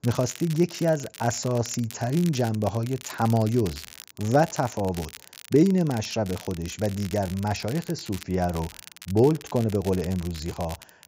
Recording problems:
high frequencies cut off; noticeable; nothing above 7.5 kHz
crackle, like an old record; noticeable; 15 dB below the speech

